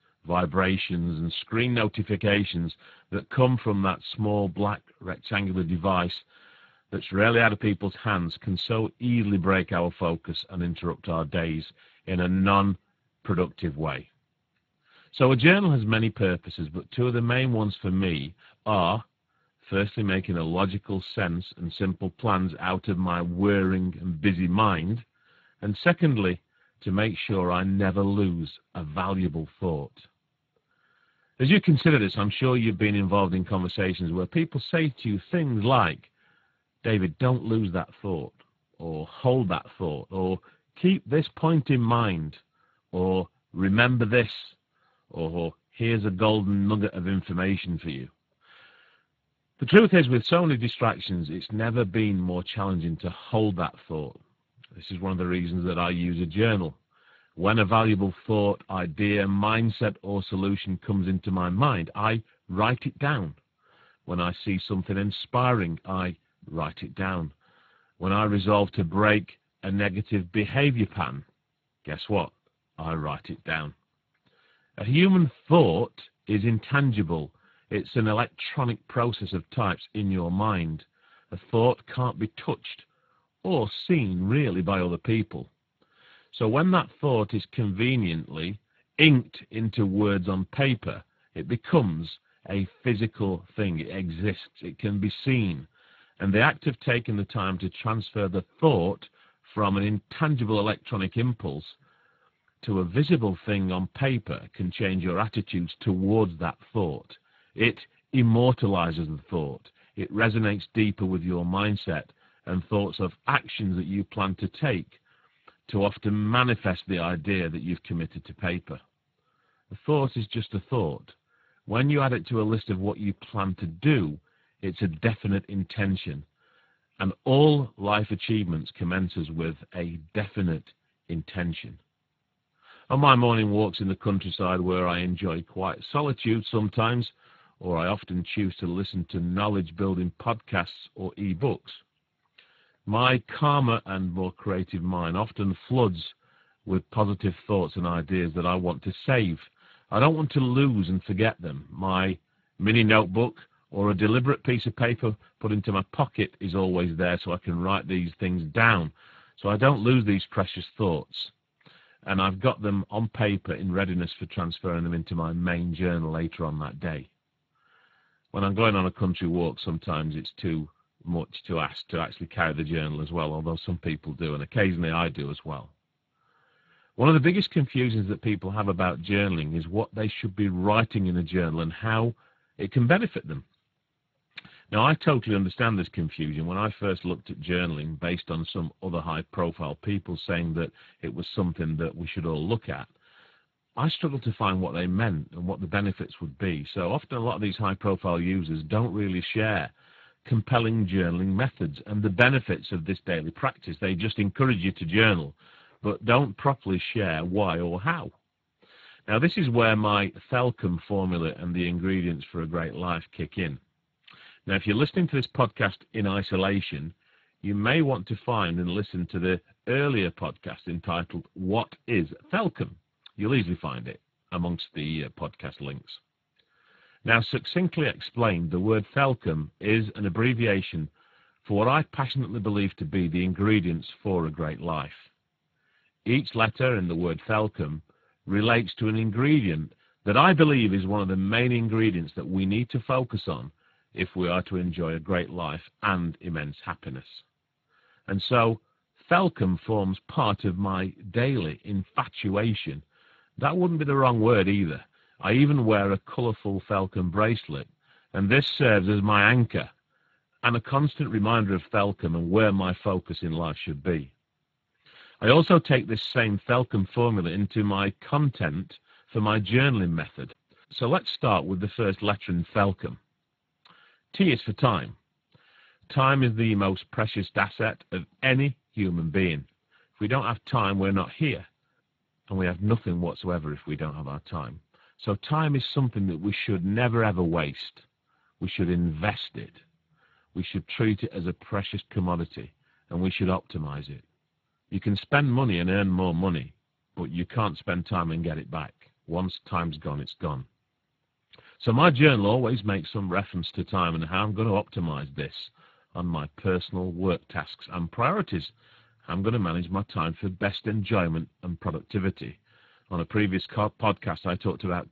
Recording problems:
garbled, watery; badly; nothing above 4 kHz

